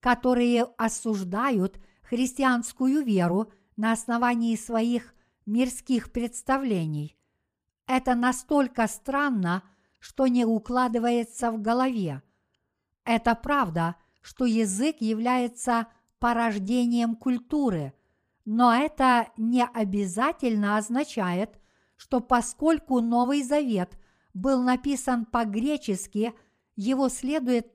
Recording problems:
none

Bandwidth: 15 kHz